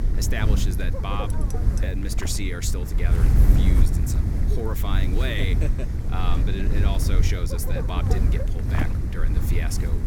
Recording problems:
wind noise on the microphone; heavy; 3 dB below the speech
clattering dishes; faint; at 1.5 s; peak 10 dB below the speech

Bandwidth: 17.5 kHz